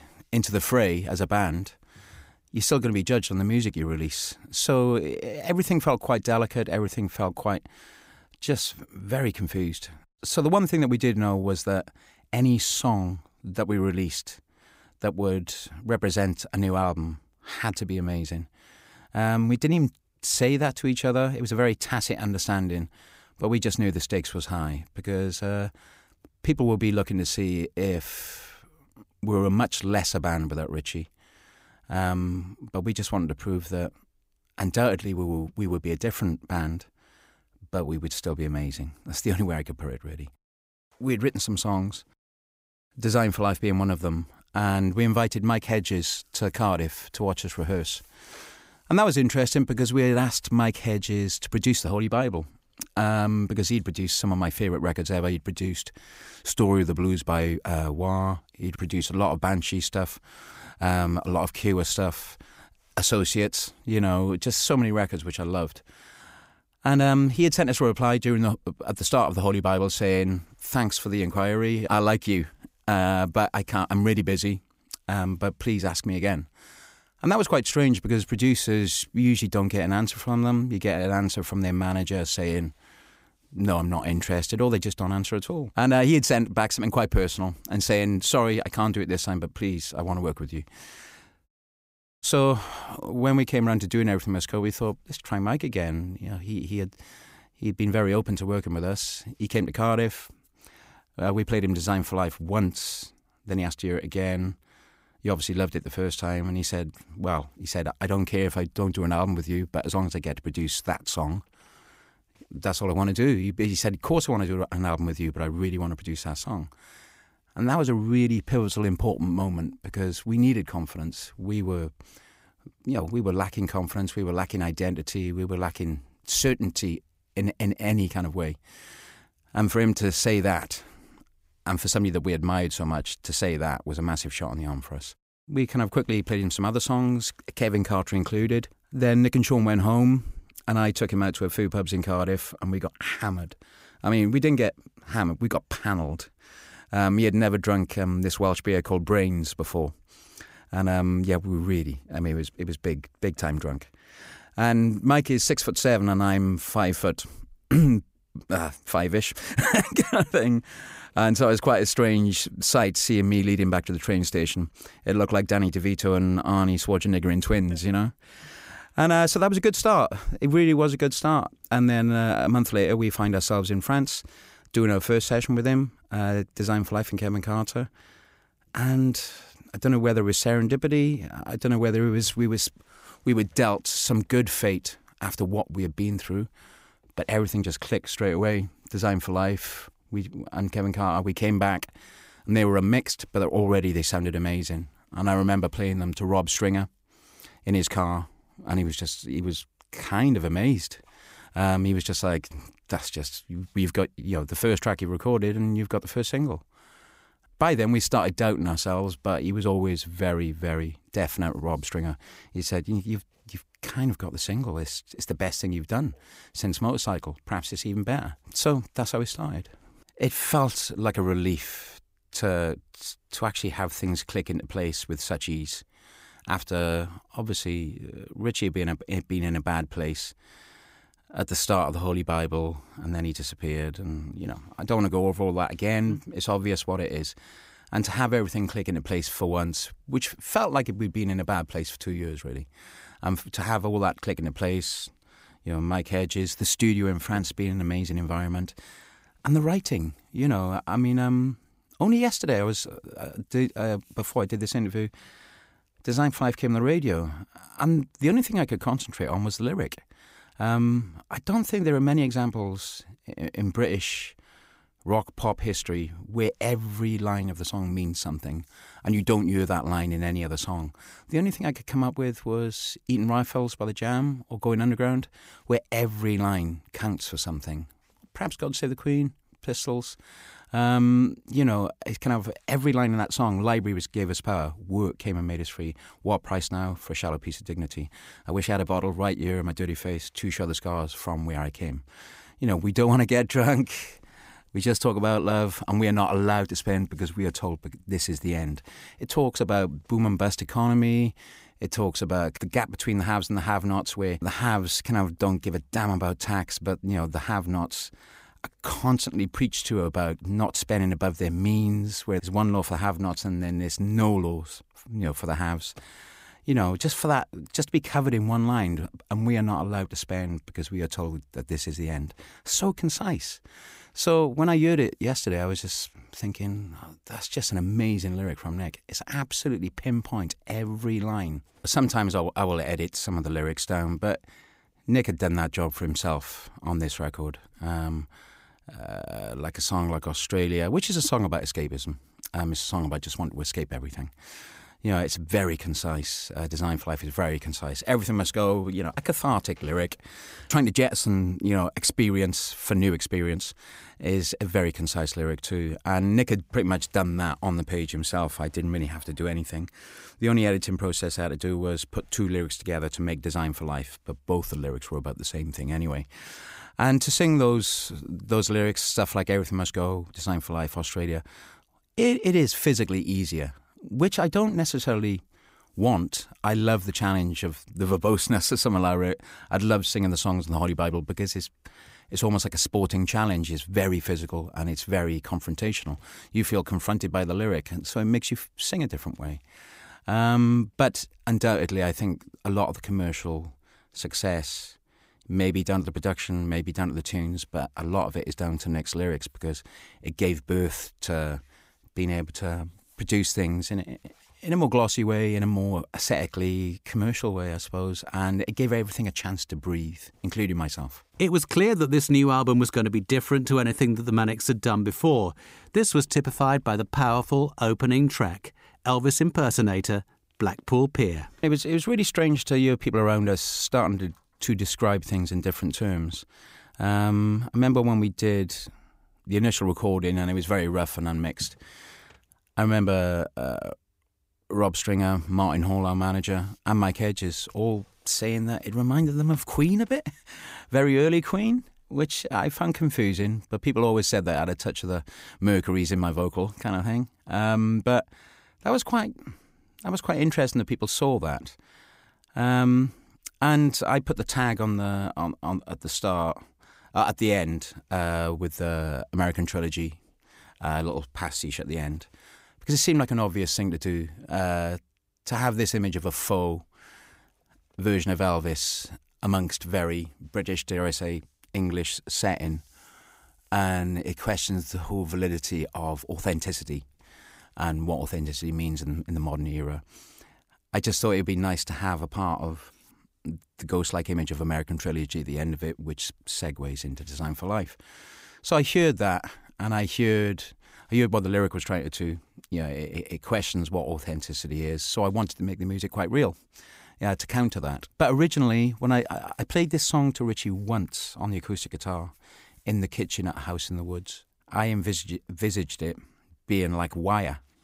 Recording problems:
audio cutting out; at 1:31 for 0.5 s

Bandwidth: 15.5 kHz